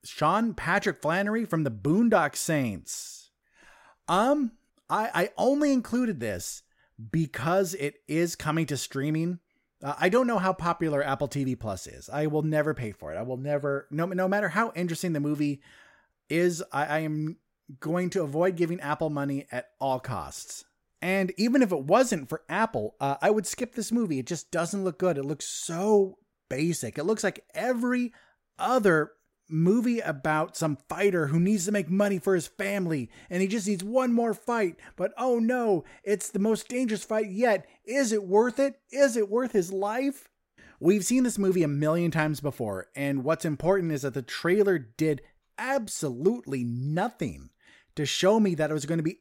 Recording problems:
none

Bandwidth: 16 kHz